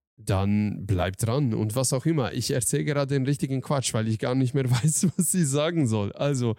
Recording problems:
none

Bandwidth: 16 kHz